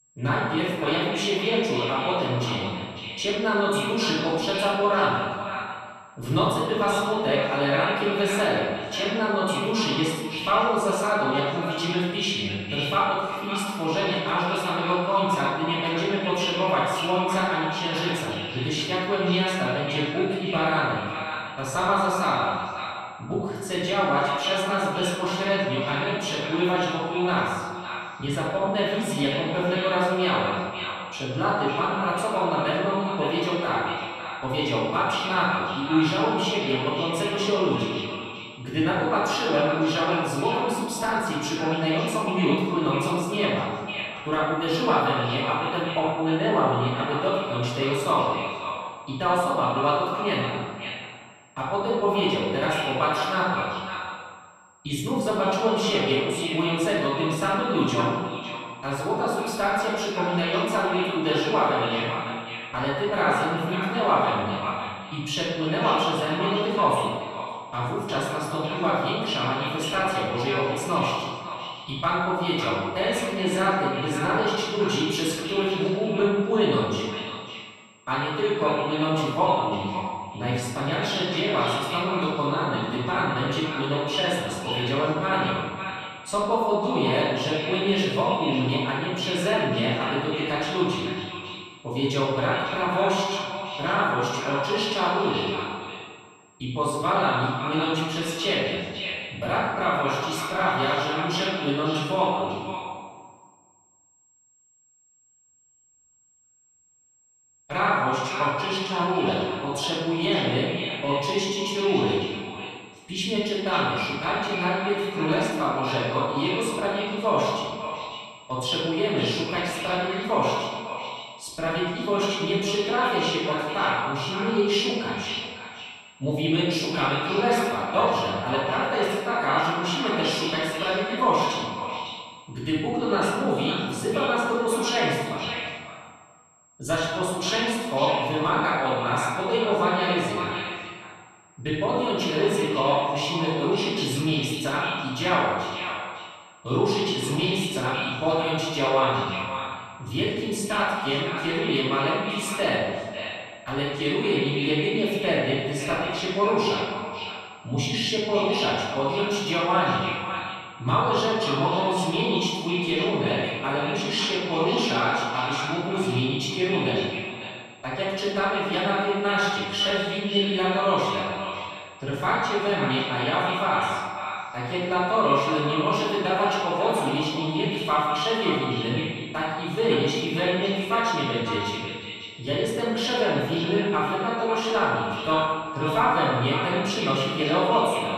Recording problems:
echo of what is said; strong; throughout; 550 ms later, 9 dB below the speech
room echo; strong; dies away in 1.5 s
off-mic speech; far
high-pitched whine; faint; throughout; 7.5 kHz, 35 dB below the speech

